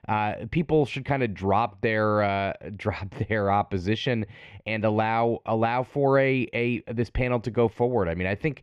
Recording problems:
muffled; slightly; fading above 3 kHz

